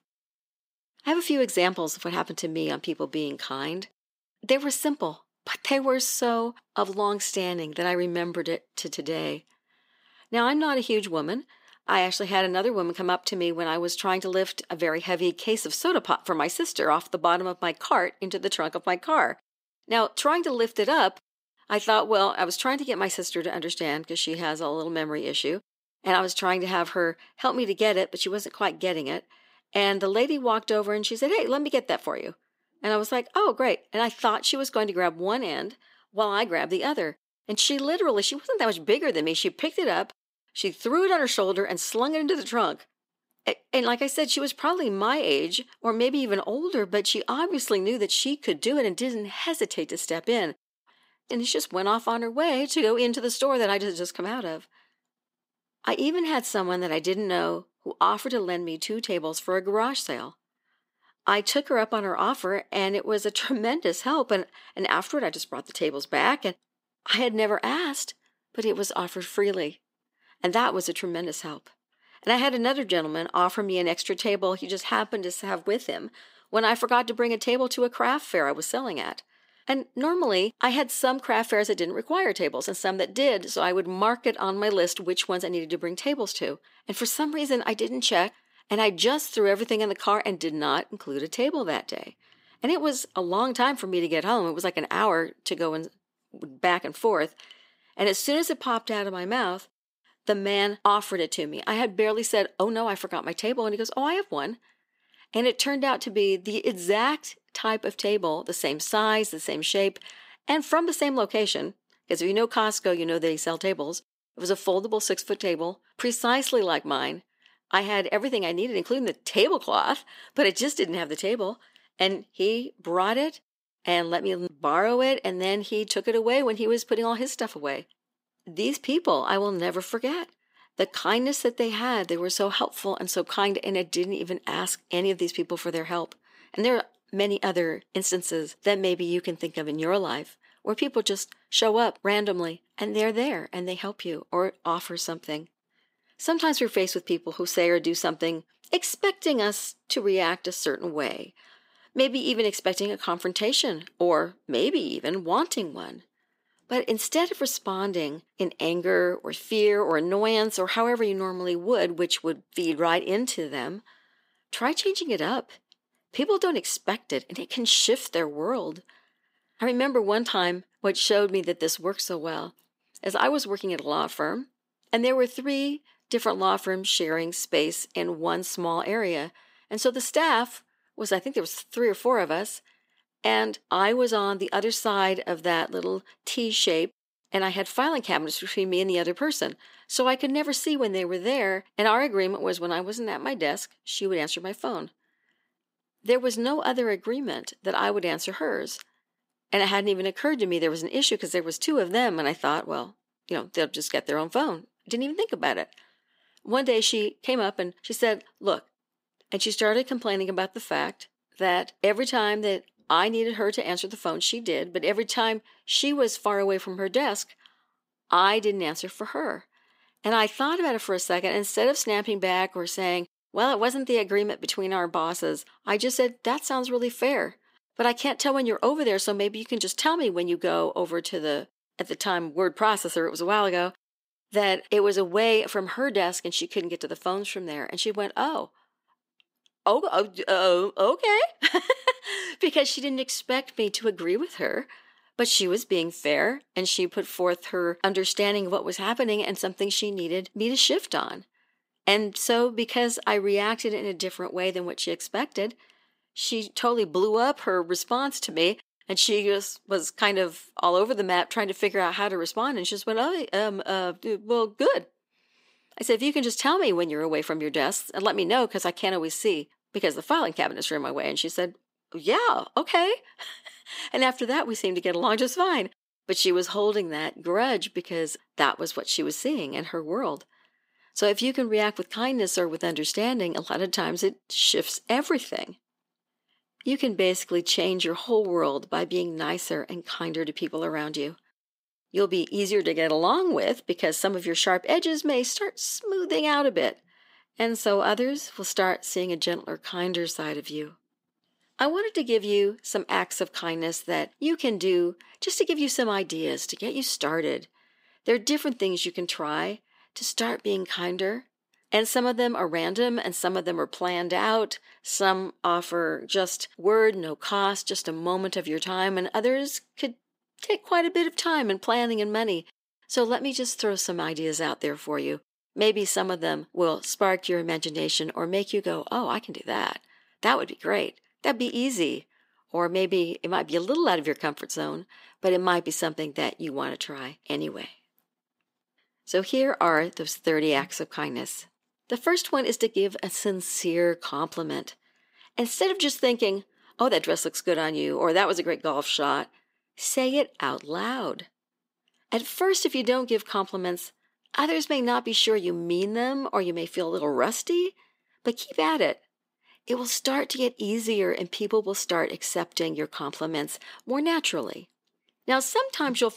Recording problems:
thin; somewhat; fading below 400 Hz

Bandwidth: 15.5 kHz